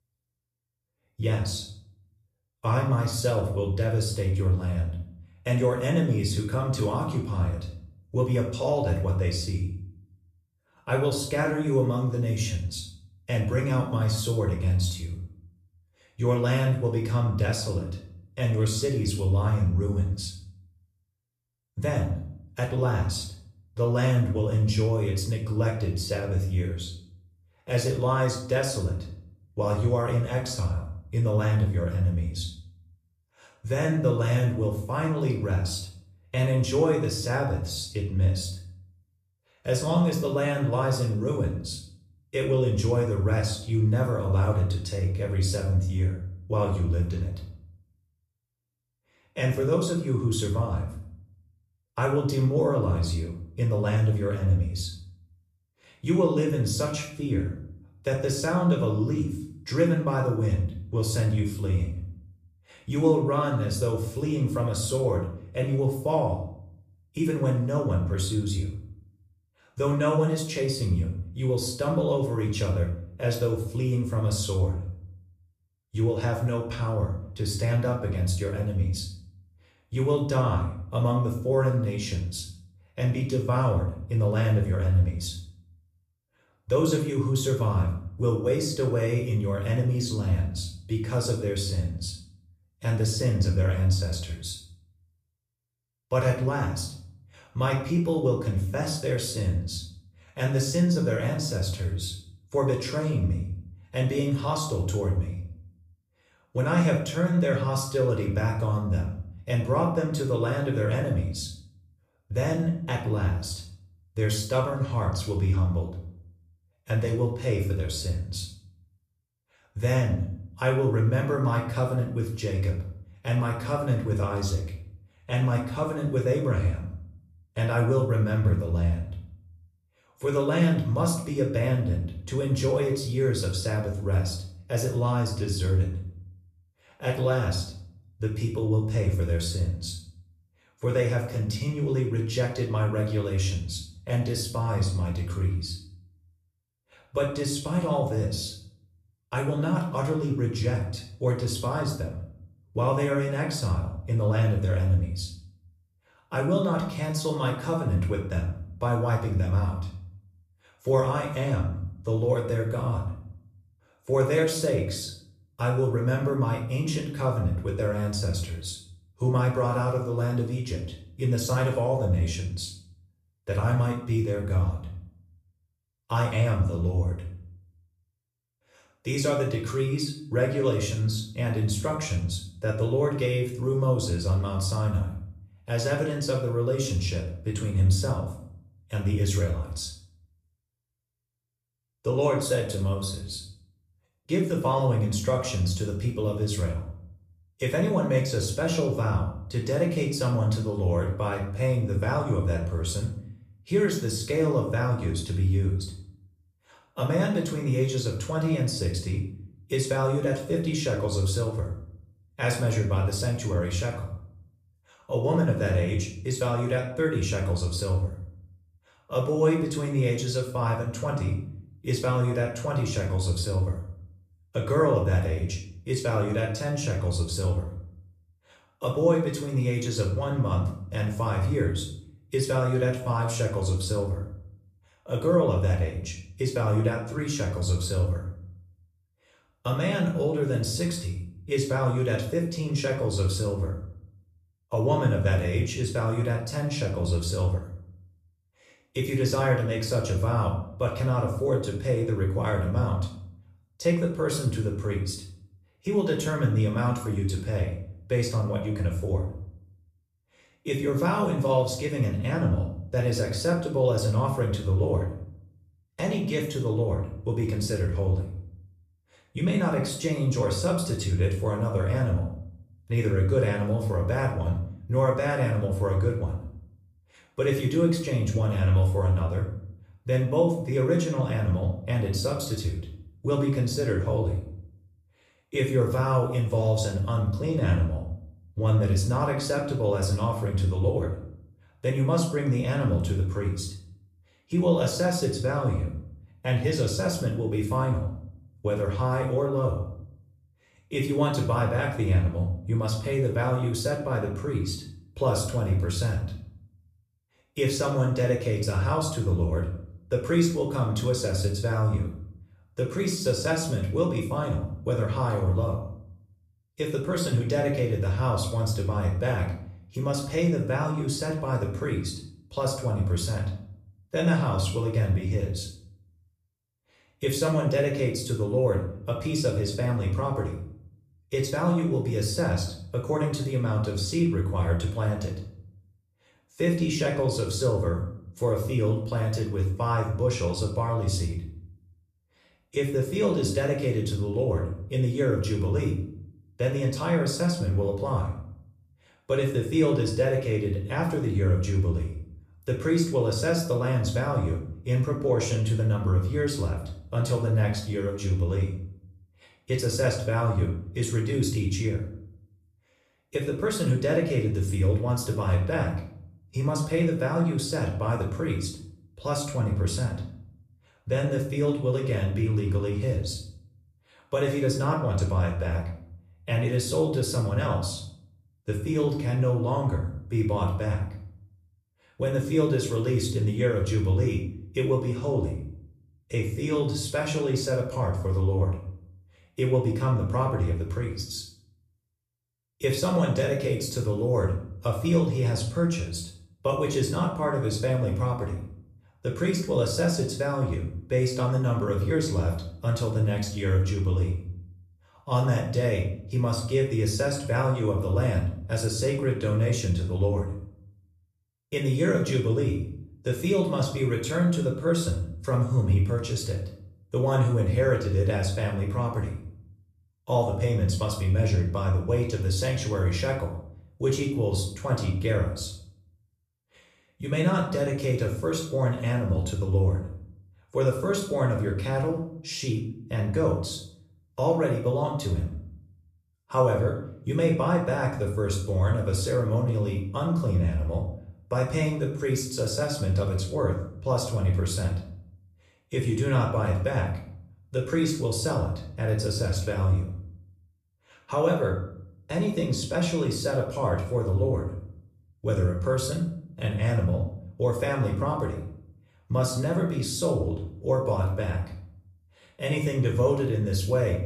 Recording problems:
room echo; slight; dies away in 0.5 s
off-mic speech; somewhat distant

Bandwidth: 14.5 kHz